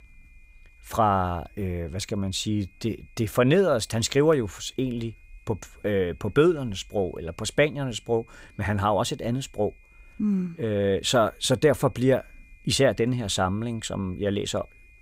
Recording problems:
high-pitched whine; faint; throughout; 2.5 kHz, 30 dB below the speech

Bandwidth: 15.5 kHz